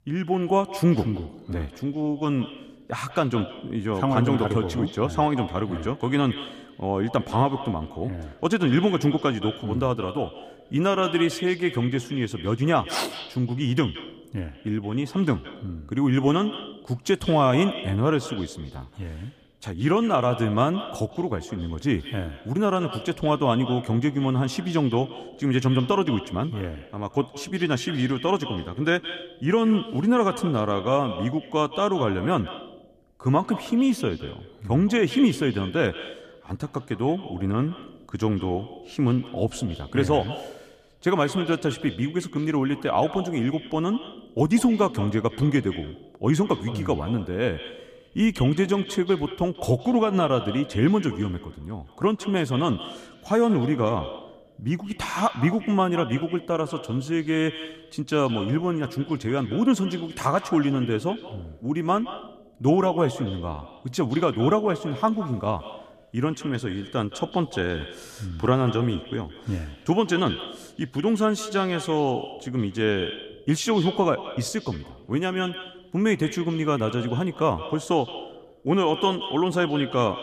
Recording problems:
echo of what is said; noticeable; throughout; 170 ms later, 15 dB below the speech

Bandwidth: 14.5 kHz